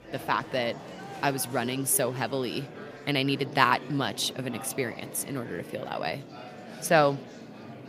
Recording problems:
murmuring crowd; noticeable; throughout; 15 dB below the speech

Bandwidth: 15 kHz